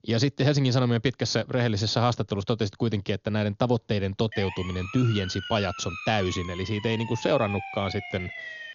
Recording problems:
high frequencies cut off; noticeable; nothing above 6.5 kHz
siren; noticeable; from 4.5 s on; peak 8 dB below the speech

